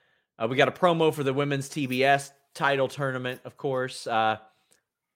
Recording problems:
none

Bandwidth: 16 kHz